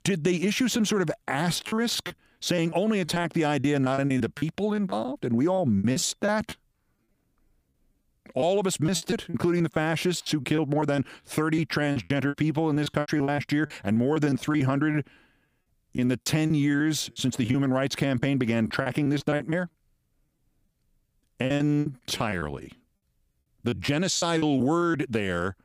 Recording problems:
choppy; very; 12% of the speech affected

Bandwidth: 15 kHz